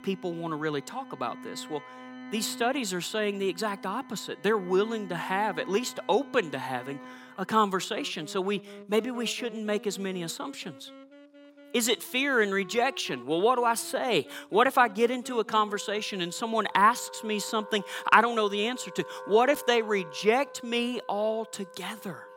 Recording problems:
background music; noticeable; throughout; 20 dB below the speech

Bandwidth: 16.5 kHz